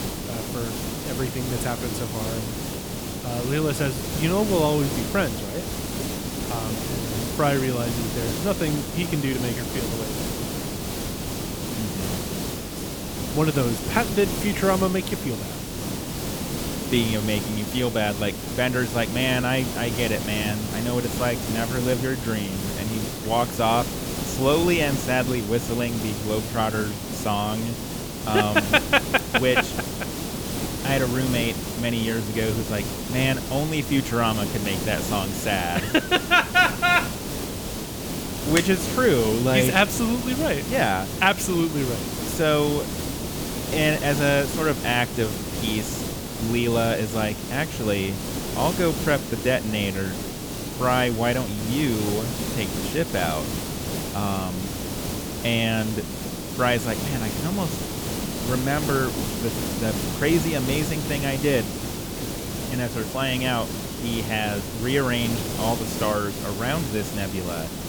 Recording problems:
hiss; loud; throughout; 4 dB below the speech

